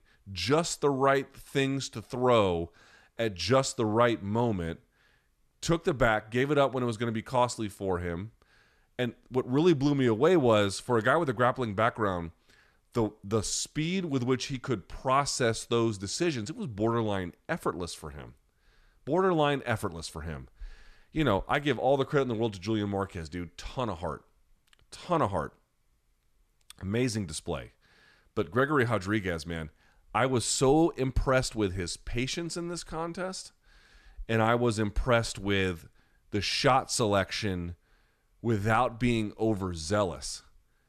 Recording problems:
none

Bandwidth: 13.5 kHz